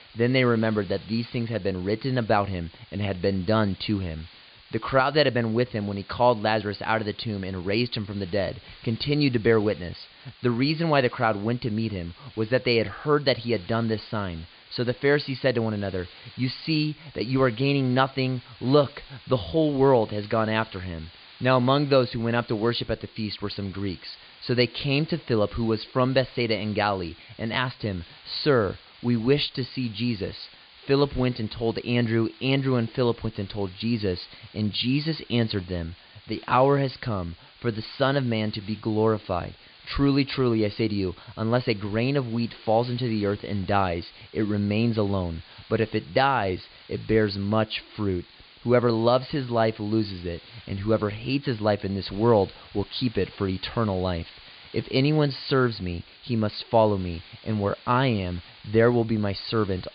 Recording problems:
high frequencies cut off; severe; nothing above 5 kHz
hiss; faint; throughout; 25 dB below the speech

